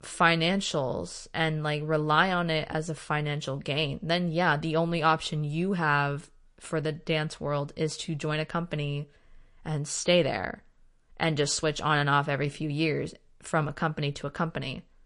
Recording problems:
garbled, watery; slightly; nothing above 10 kHz

